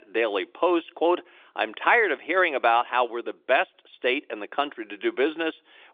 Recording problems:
phone-call audio

